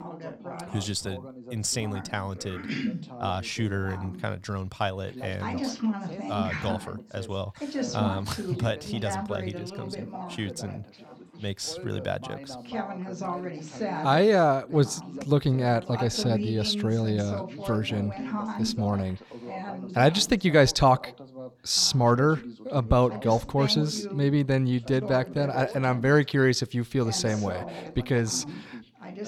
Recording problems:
background chatter; loud; throughout; 2 voices, 10 dB below the speech

